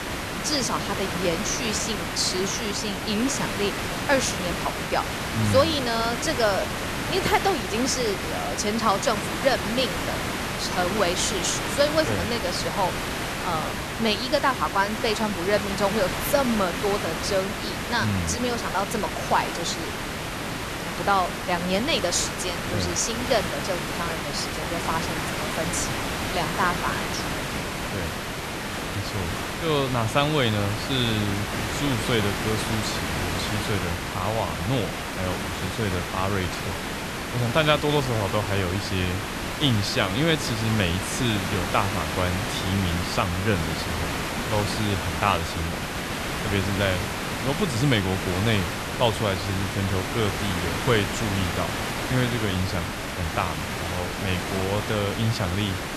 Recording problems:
hiss; loud; throughout; 2 dB below the speech

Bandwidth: 13.5 kHz